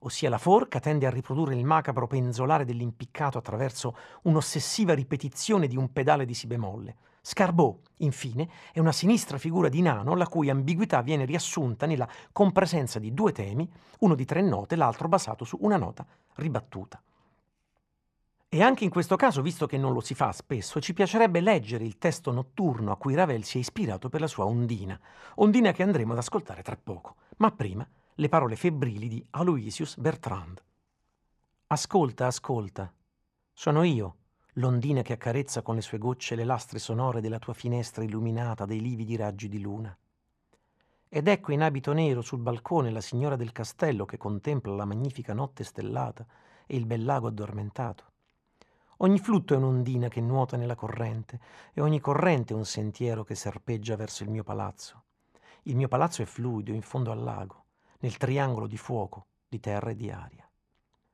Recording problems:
muffled; slightly; fading above 3.5 kHz

